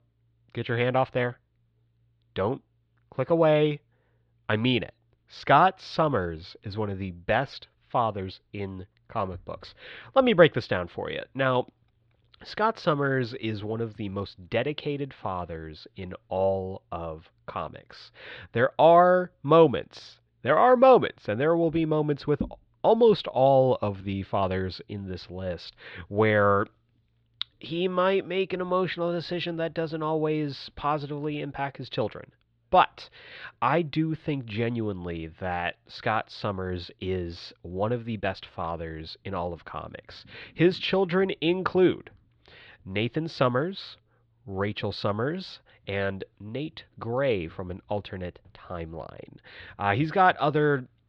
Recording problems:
muffled; slightly; fading above 4 kHz

